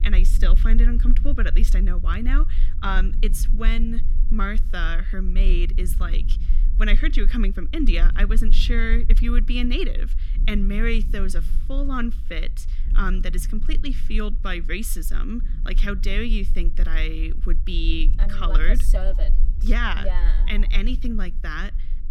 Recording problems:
low rumble; noticeable; throughout; 15 dB below the speech

